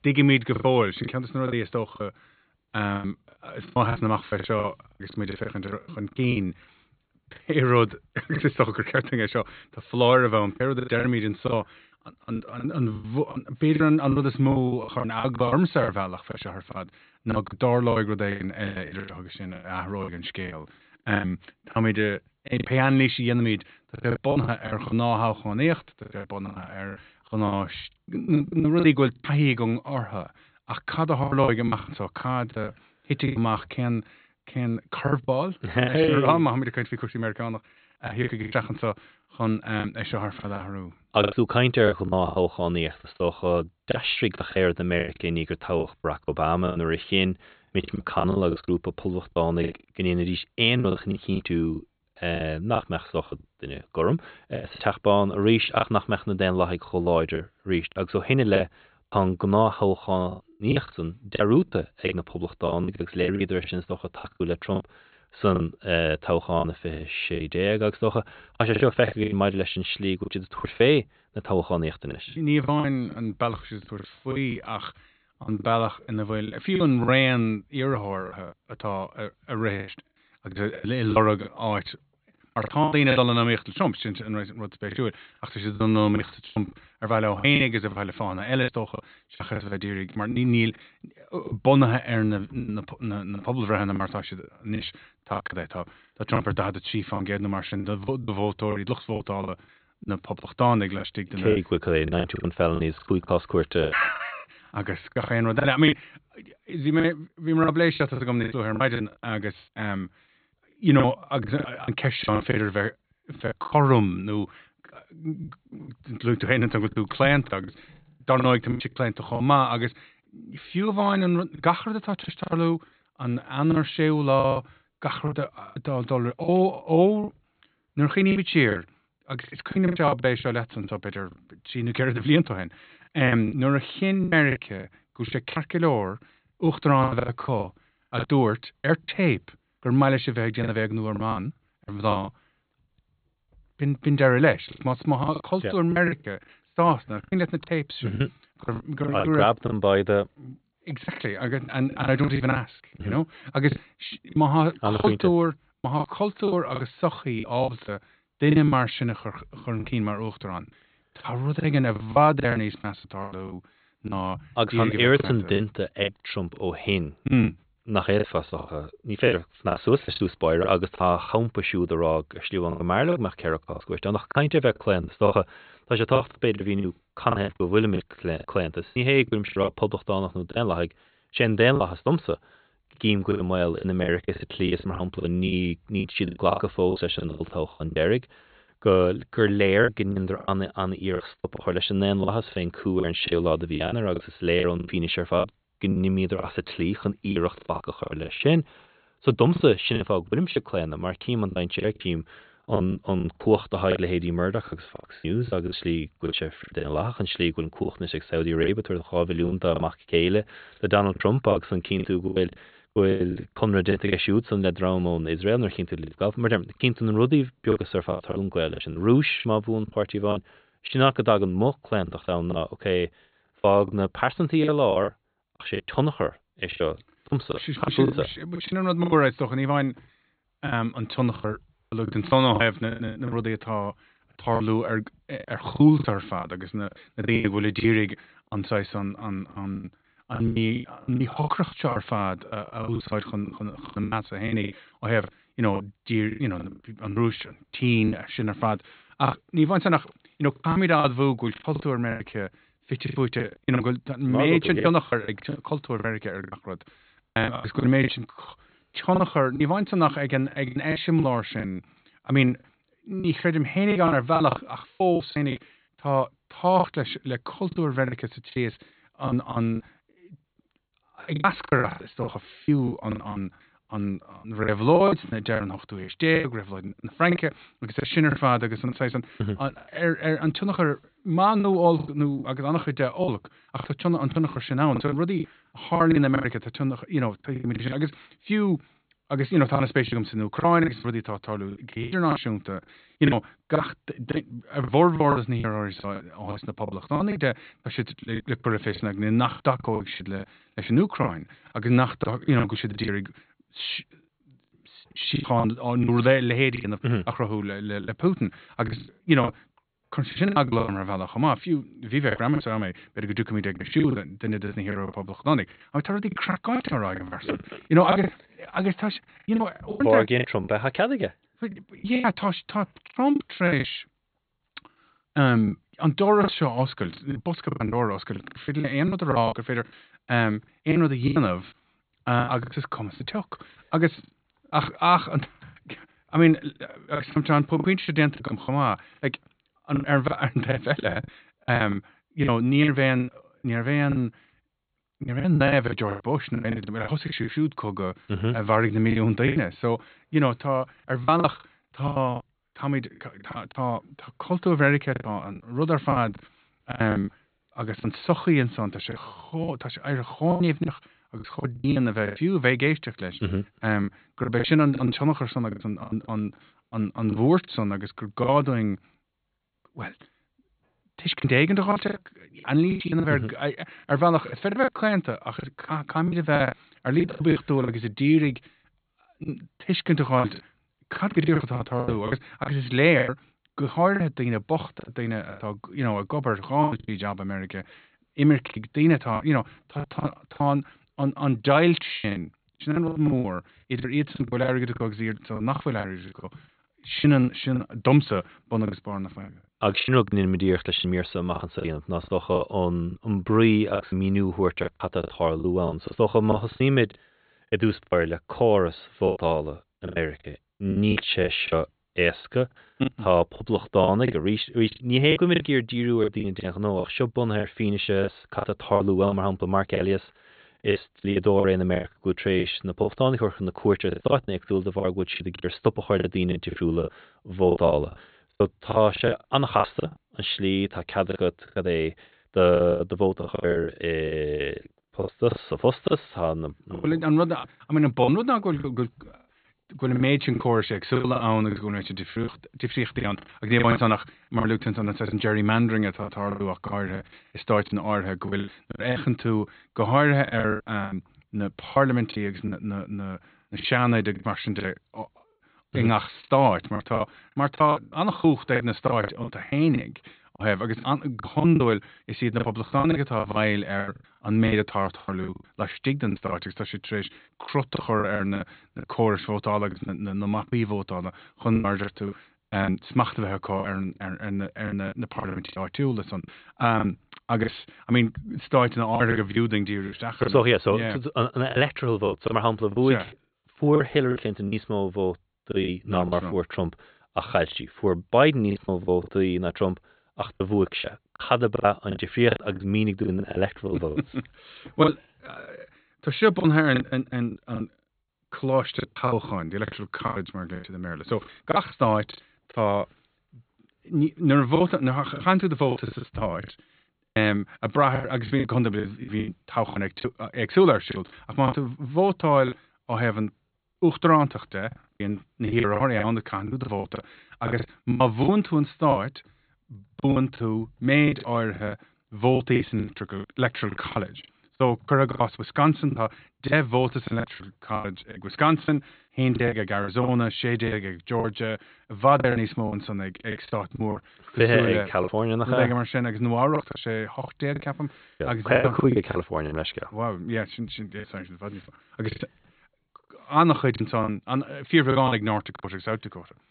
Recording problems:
high frequencies cut off; severe; nothing above 4.5 kHz
choppy; very; 12% of the speech affected

